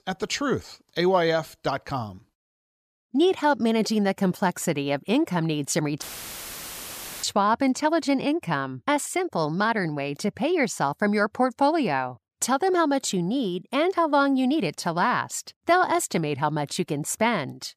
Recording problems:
audio cutting out; filled with static; at 6 s for 1 s

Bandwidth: 14.5 kHz